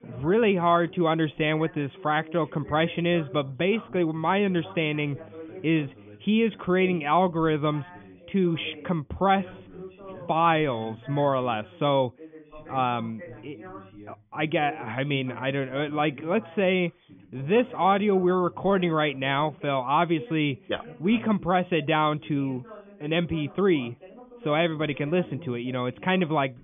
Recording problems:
high frequencies cut off; severe; nothing above 3.5 kHz
background chatter; noticeable; throughout; 2 voices, 20 dB below the speech

